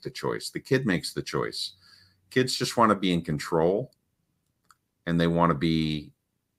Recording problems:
none

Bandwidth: 15.5 kHz